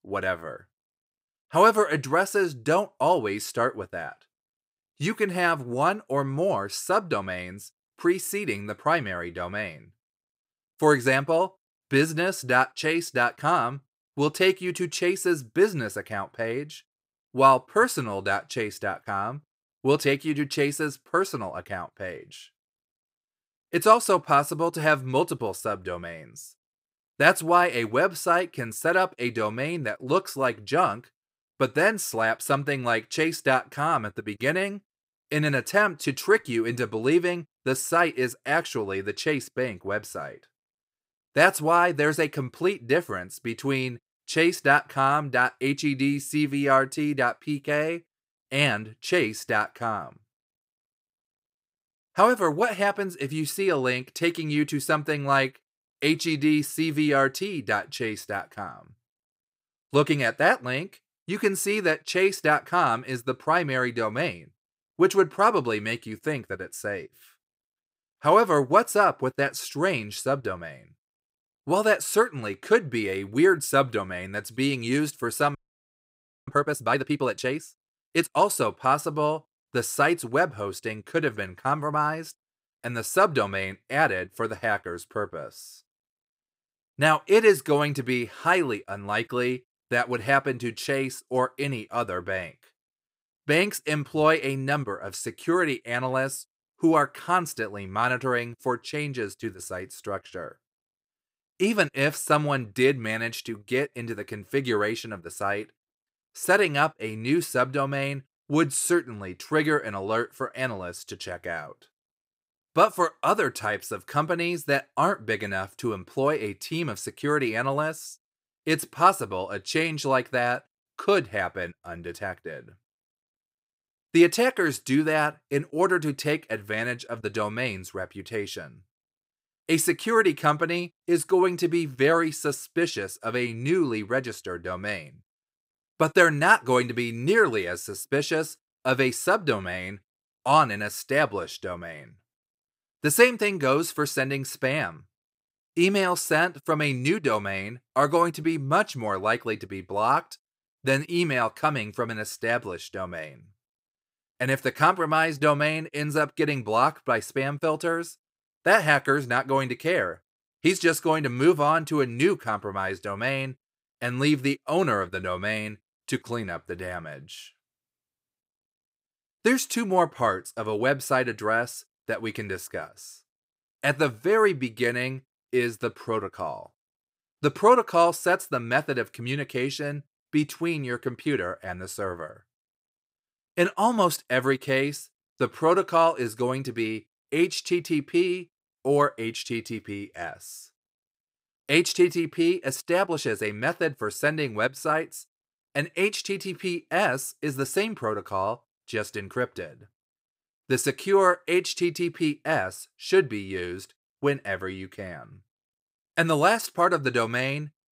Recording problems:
audio freezing; at 1:16 for 1 s

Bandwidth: 15.5 kHz